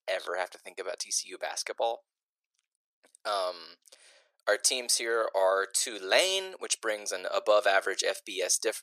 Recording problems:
thin; very; fading below 400 Hz

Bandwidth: 14.5 kHz